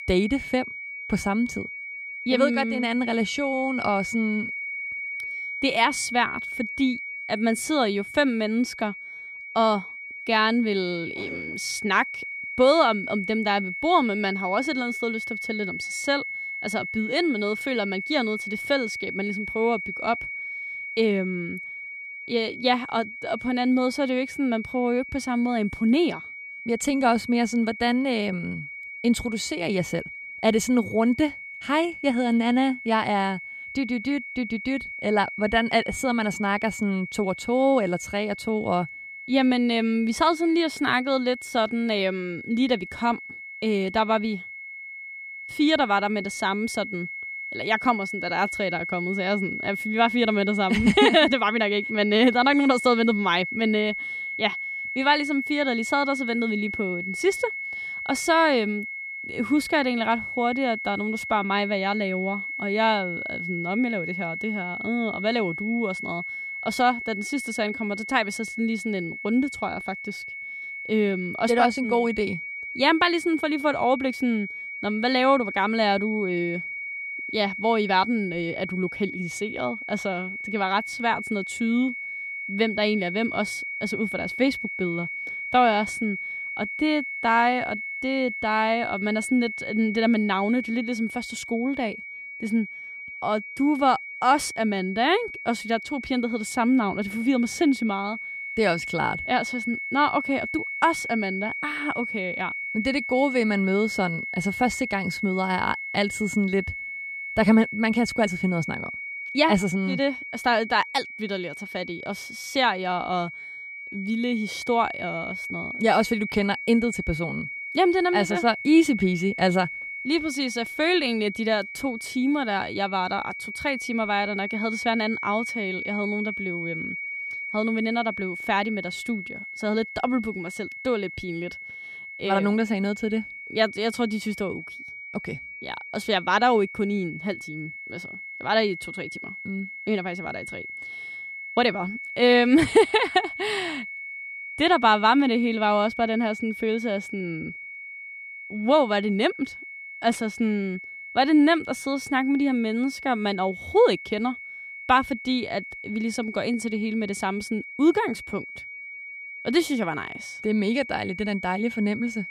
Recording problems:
high-pitched whine; loud; throughout; 2 kHz, 8 dB below the speech

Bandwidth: 14.5 kHz